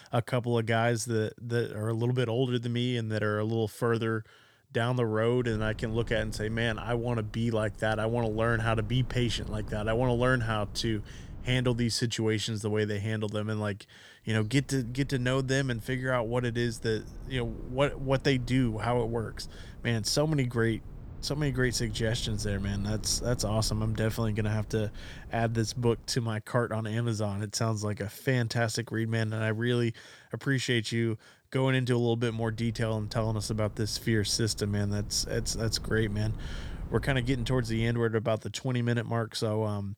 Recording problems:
low rumble; faint; from 5.5 to 12 s, from 14 to 26 s and from 32 to 38 s; 25 dB below the speech

